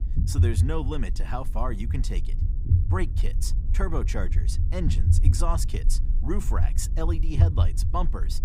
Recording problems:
low rumble; loud; throughout; 8 dB below the speech

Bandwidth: 15.5 kHz